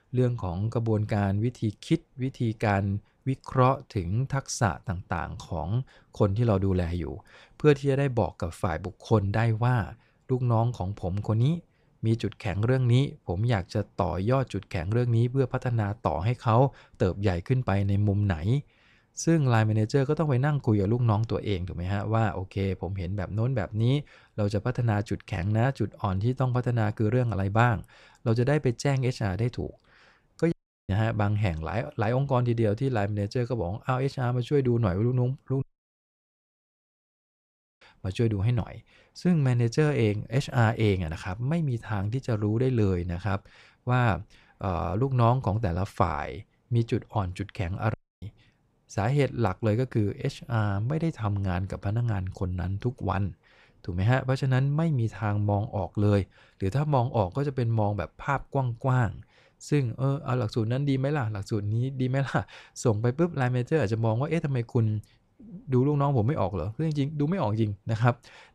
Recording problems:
audio cutting out; at 31 s, at 36 s for 2 s and at 48 s

